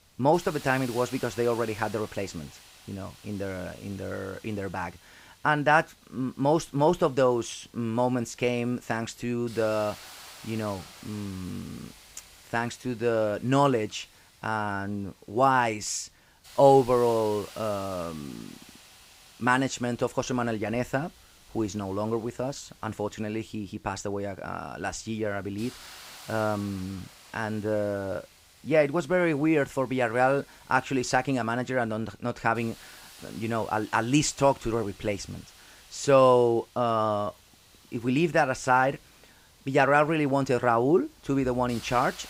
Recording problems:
hiss; faint; throughout; 20 dB below the speech

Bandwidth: 15.5 kHz